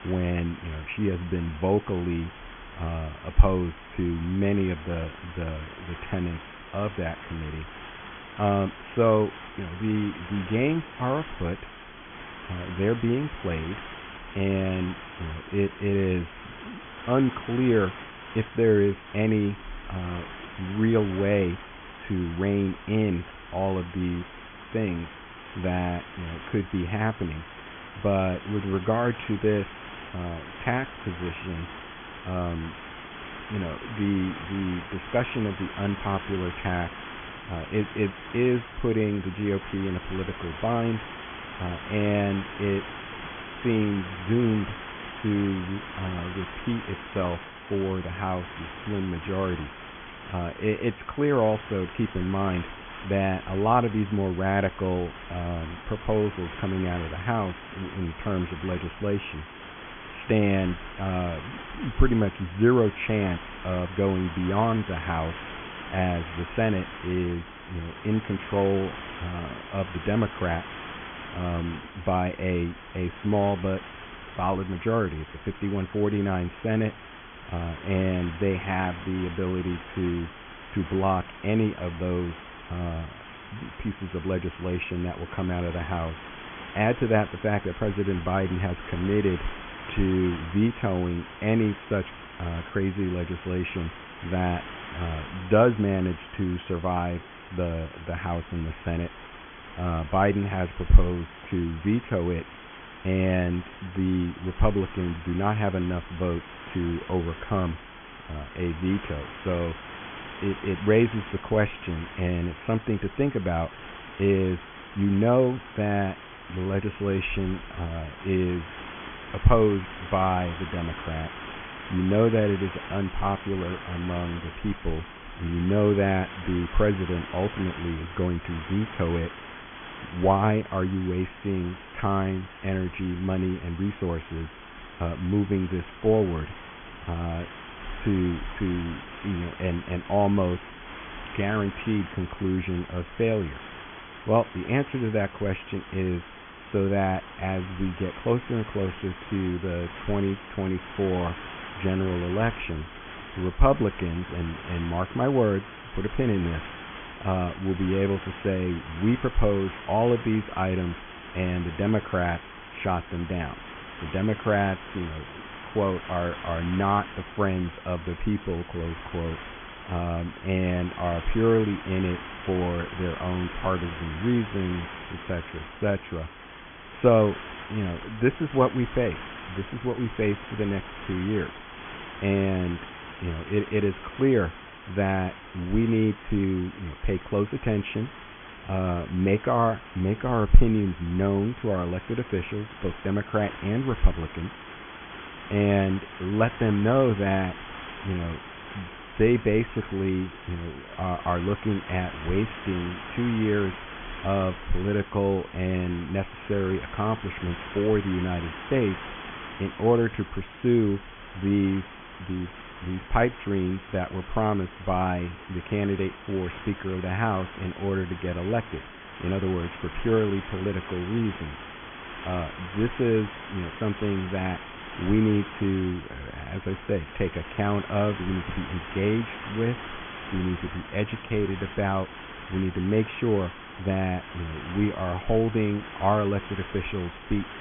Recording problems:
high frequencies cut off; severe; nothing above 3.5 kHz
hiss; noticeable; throughout; 10 dB below the speech

